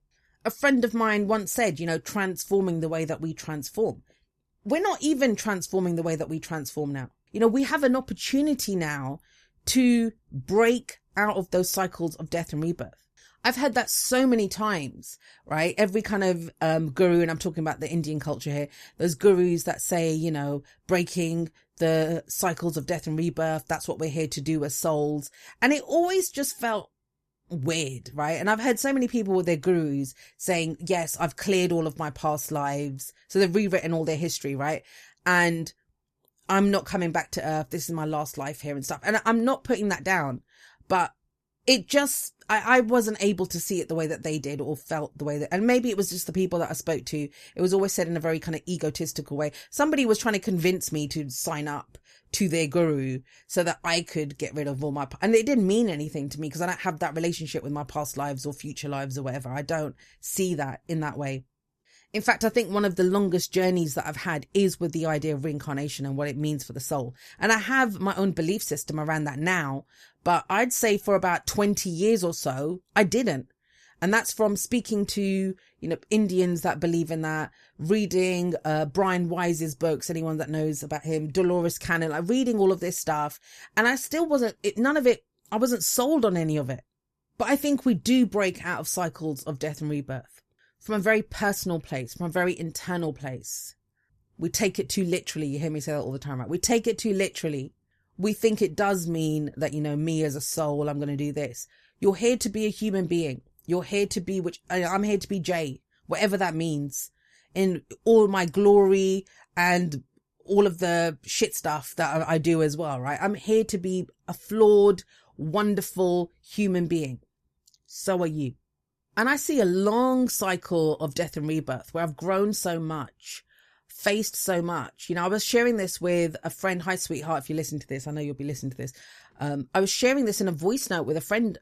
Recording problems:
none

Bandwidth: 14.5 kHz